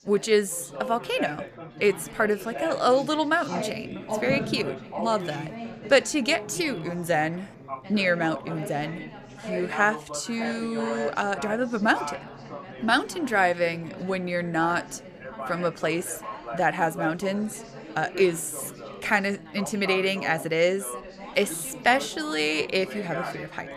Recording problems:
background chatter; noticeable; throughout; 4 voices, 10 dB below the speech

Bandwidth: 14.5 kHz